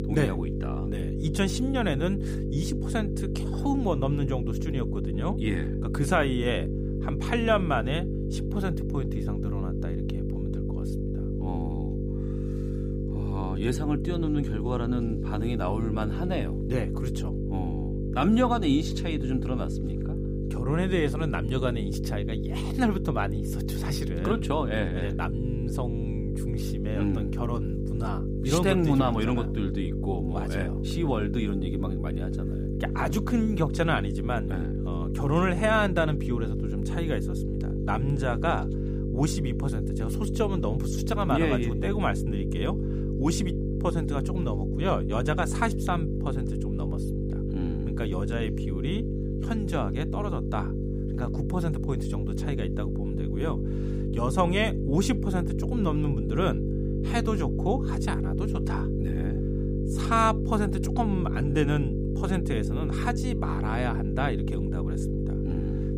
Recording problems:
electrical hum; loud; throughout; 50 Hz, 6 dB below the speech

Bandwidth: 15.5 kHz